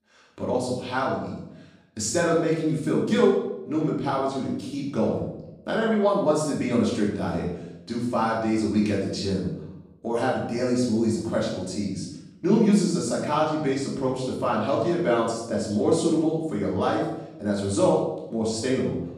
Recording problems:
off-mic speech; far
room echo; noticeable; dies away in 0.7 s

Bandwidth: 15 kHz